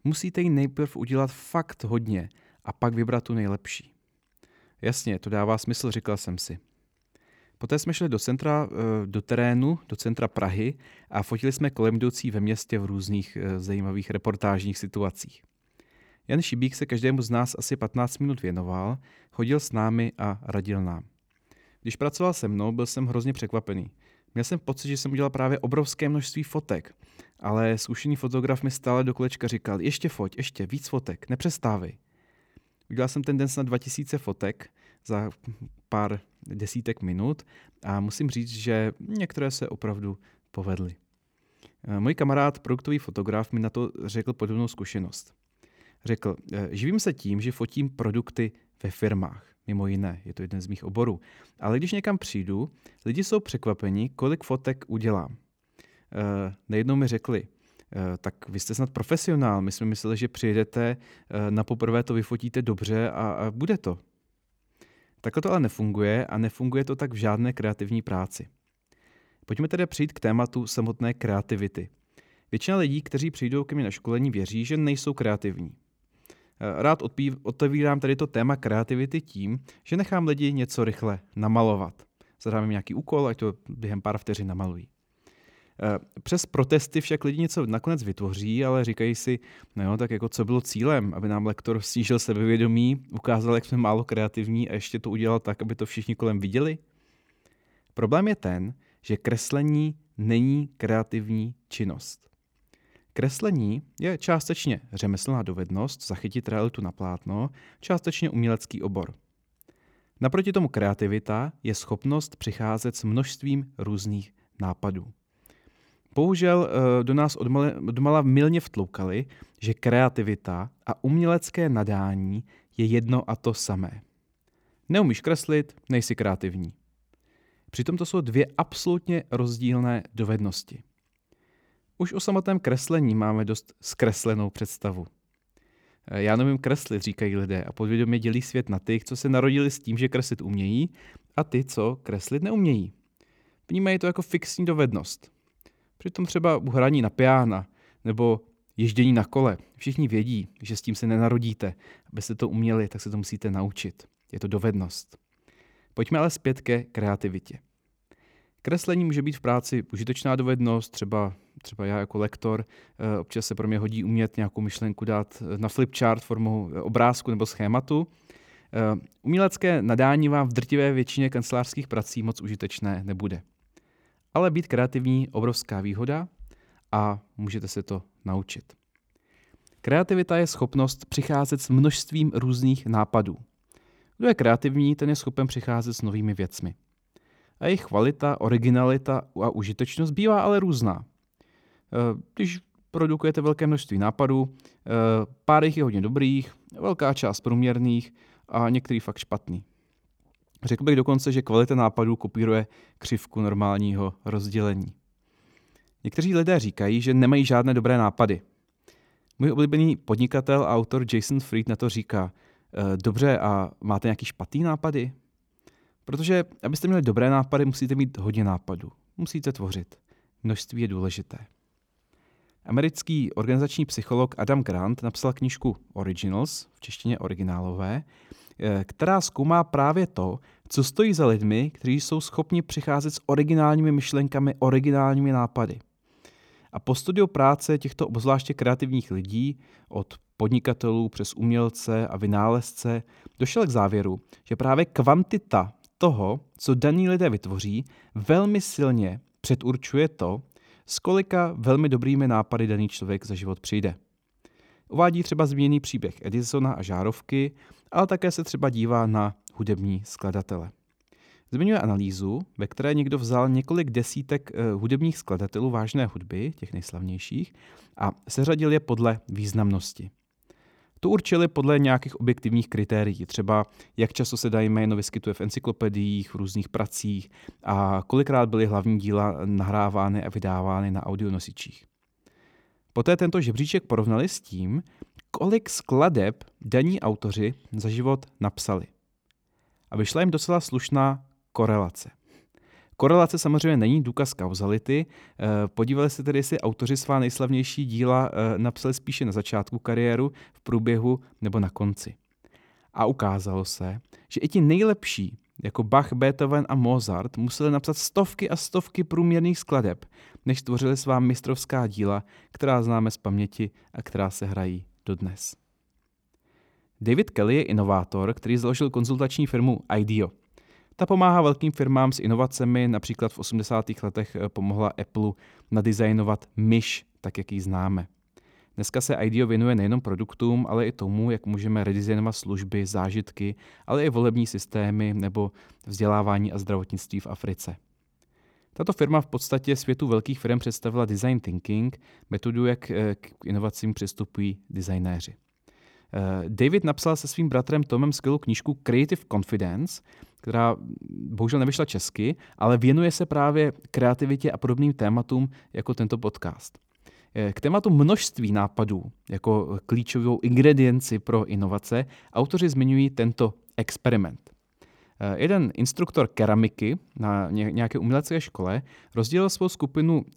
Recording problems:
none

